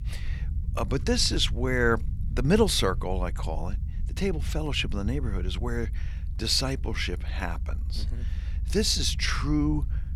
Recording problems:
low rumble; faint; throughout; 20 dB below the speech

